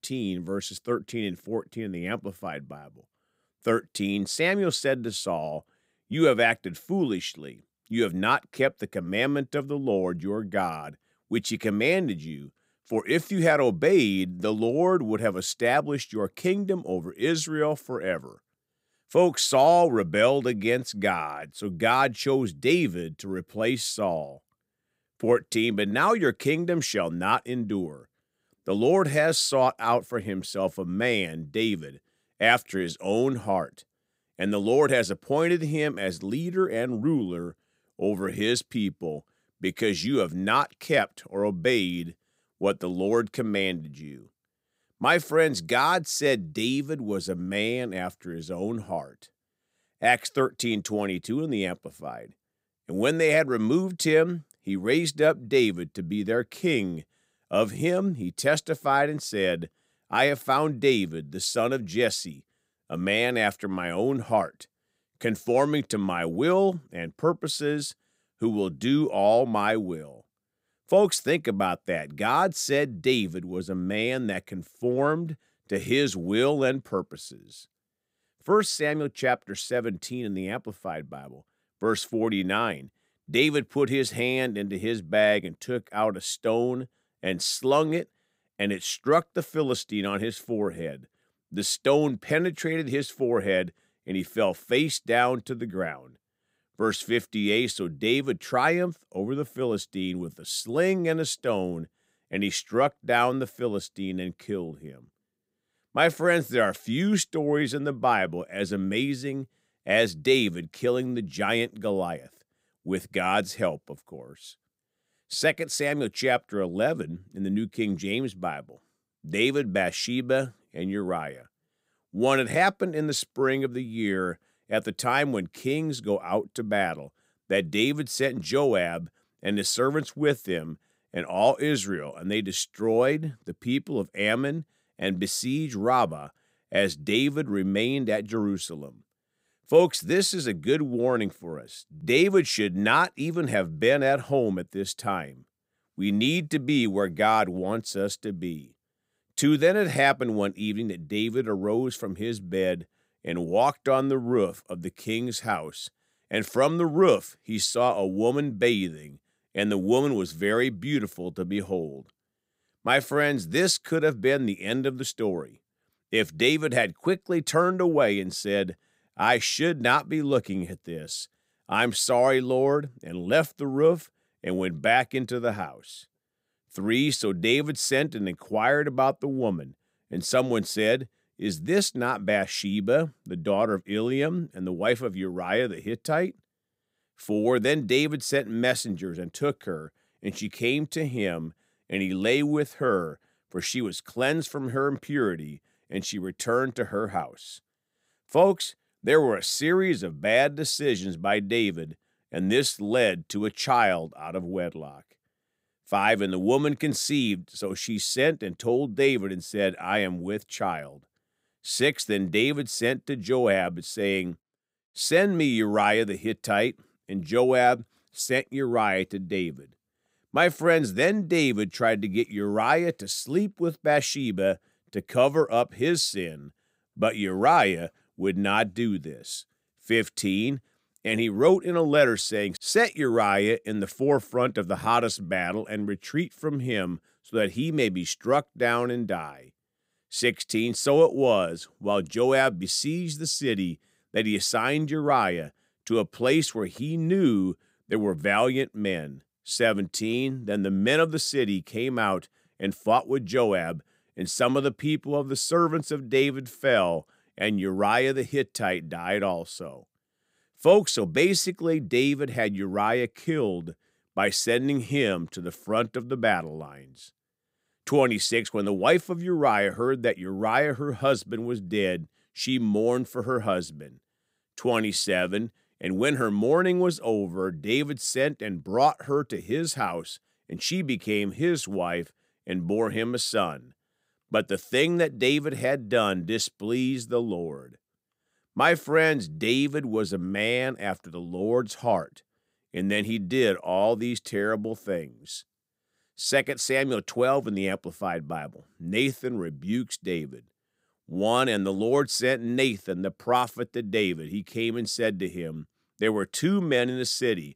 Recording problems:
none

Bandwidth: 15.5 kHz